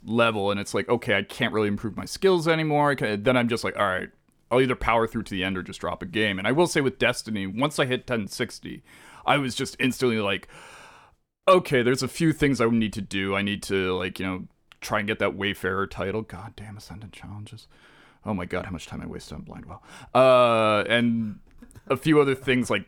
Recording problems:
none

